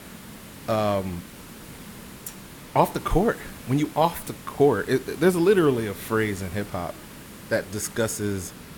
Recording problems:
hiss; noticeable; throughout; 15 dB below the speech

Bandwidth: 17.5 kHz